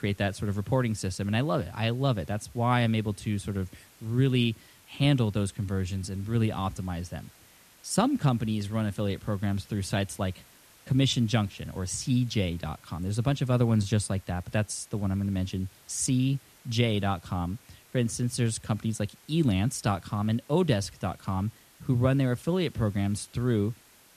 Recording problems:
hiss; faint; throughout; 25 dB below the speech

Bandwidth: 14 kHz